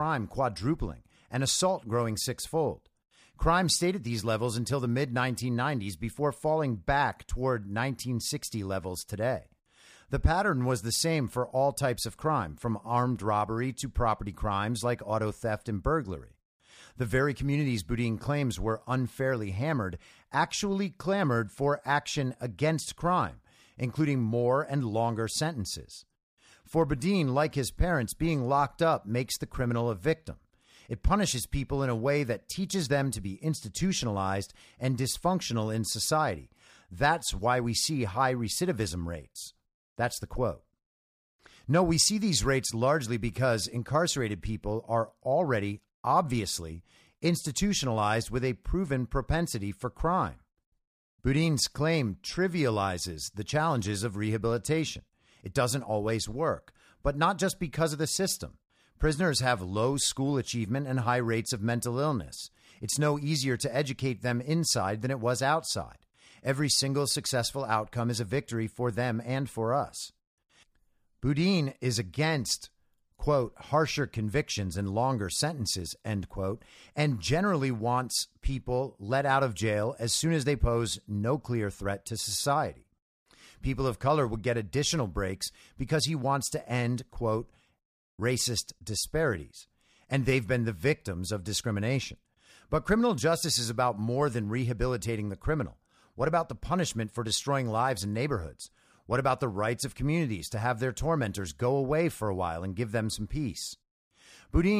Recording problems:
abrupt cut into speech; at the start and the end

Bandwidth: 15 kHz